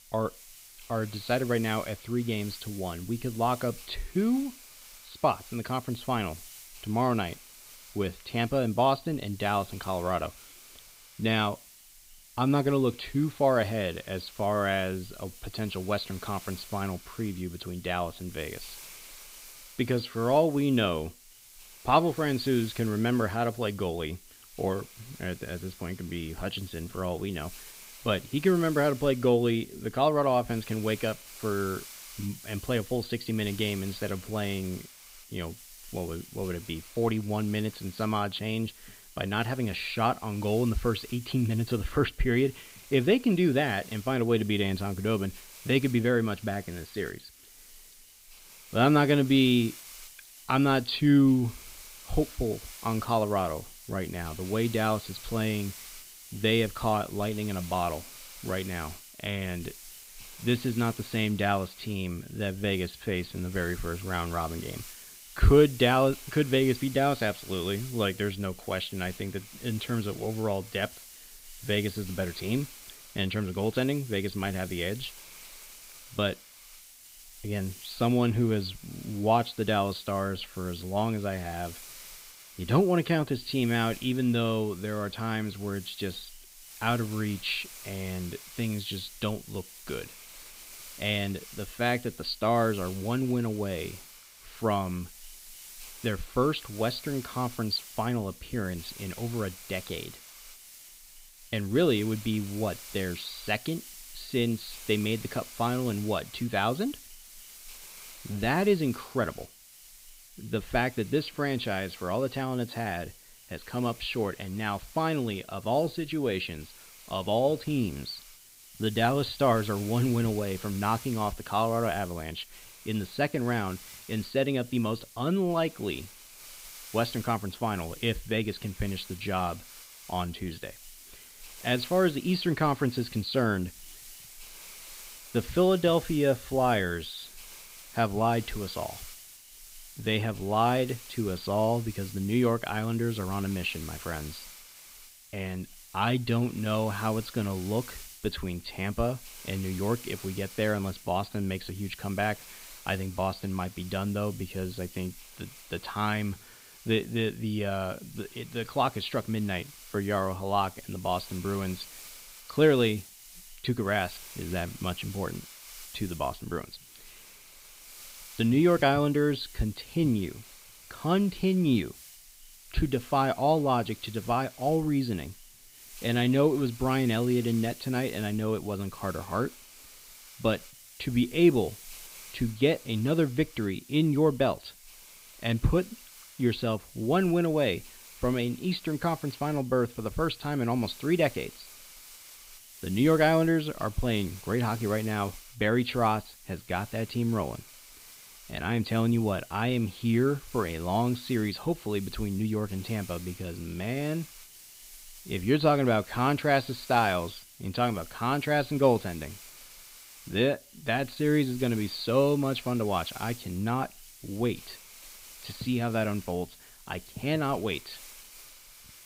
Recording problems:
high frequencies cut off; severe; nothing above 5 kHz
hiss; noticeable; throughout; 15 dB below the speech

